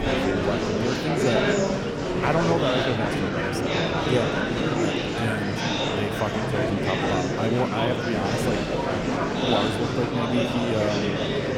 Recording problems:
murmuring crowd; very loud; throughout; 4 dB above the speech
animal sounds; faint; throughout; 25 dB below the speech

